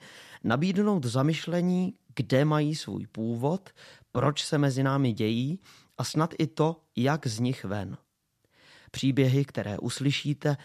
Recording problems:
none

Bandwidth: 14 kHz